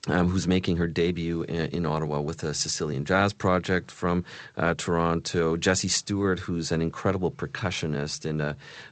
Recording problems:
garbled, watery; slightly; nothing above 8 kHz

